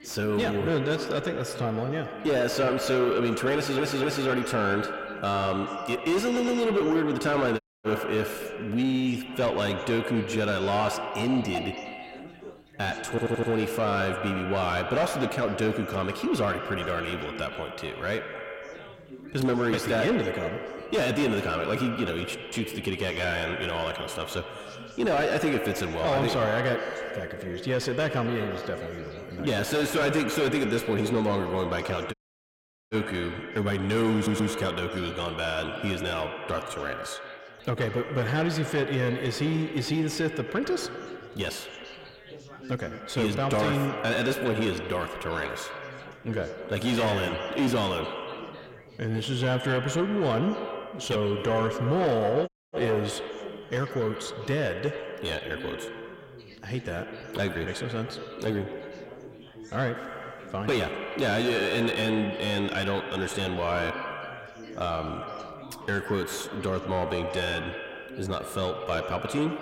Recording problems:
distortion; heavy; 6 dB below the speech
echo of what is said; strong; throughout; 100 ms later, 7 dB below the speech
background chatter; noticeable; throughout; 4 voices, 15 dB below the speech
audio stuttering; 4 times, first at 3.5 s
audio cutting out; at 7.5 s, at 32 s for 1 s and at 52 s

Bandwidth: 16 kHz